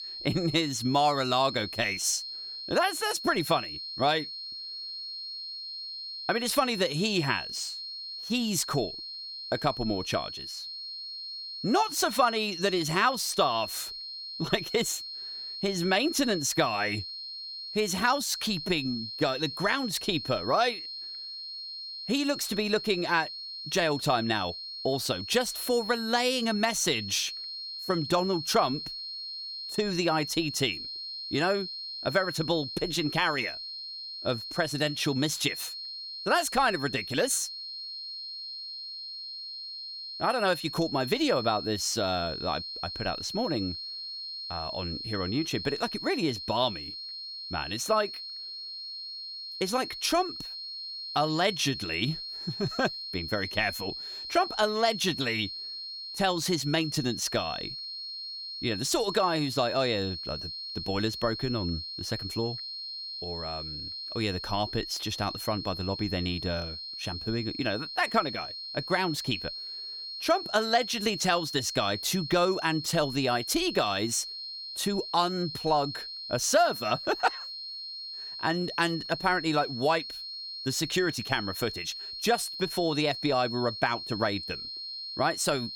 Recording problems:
high-pitched whine; loud; throughout; 4.5 kHz, 7 dB below the speech

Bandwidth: 17.5 kHz